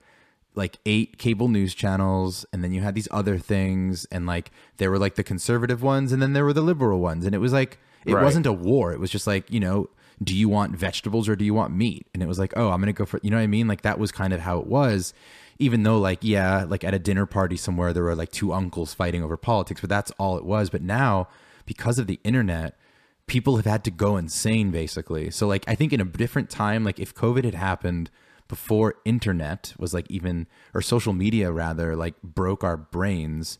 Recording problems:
none

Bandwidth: 14.5 kHz